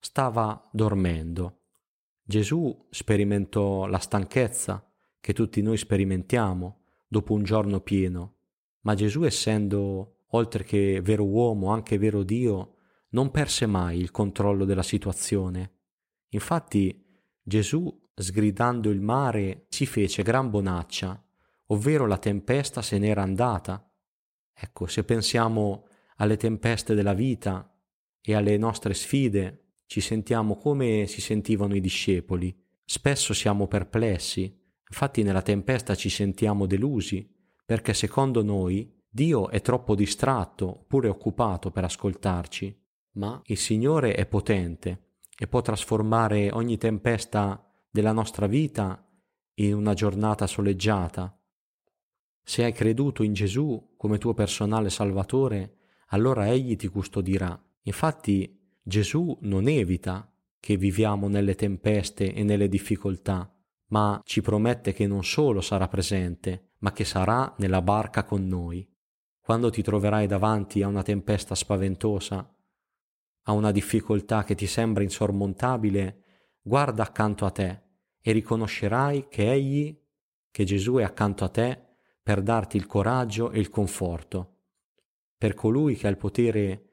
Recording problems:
none

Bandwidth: 16 kHz